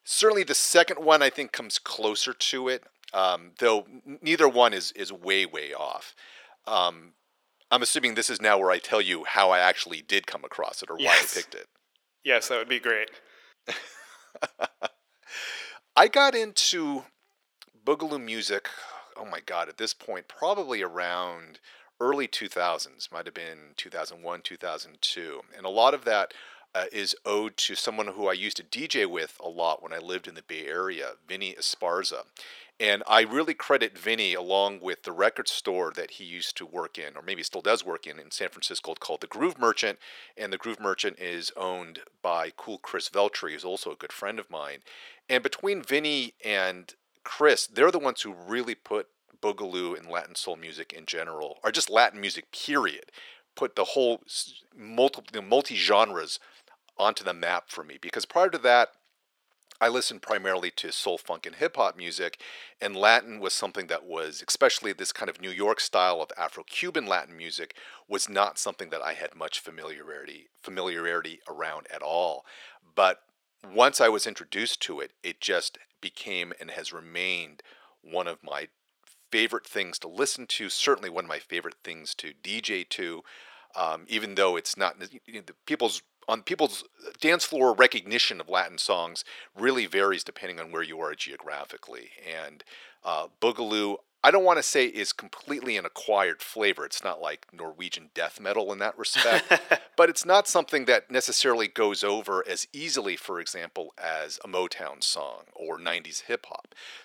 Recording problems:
thin; very; fading below 450 Hz

